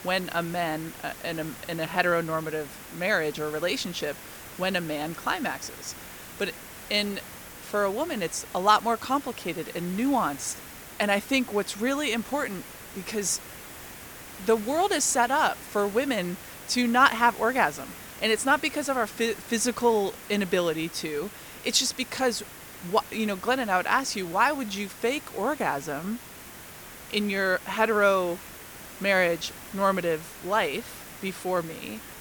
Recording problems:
hiss; noticeable; throughout; 15 dB below the speech

